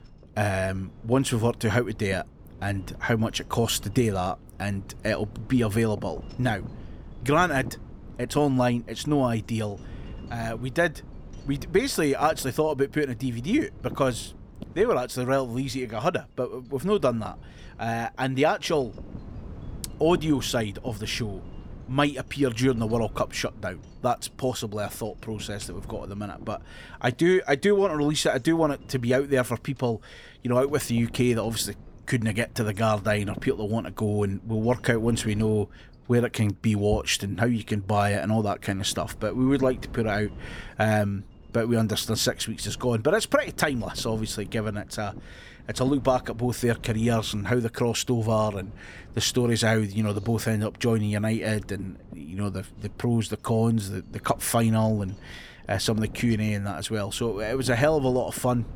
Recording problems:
wind noise on the microphone; occasional gusts; 25 dB below the speech

